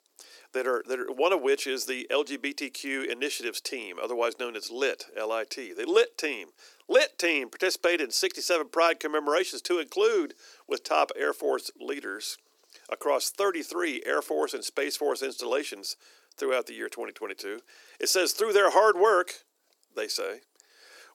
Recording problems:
thin; somewhat; fading below 350 Hz

